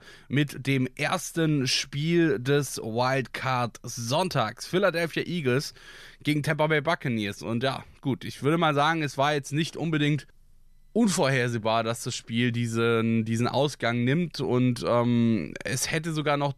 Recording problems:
none

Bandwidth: 14 kHz